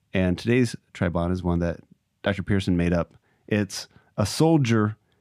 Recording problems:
none

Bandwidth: 15 kHz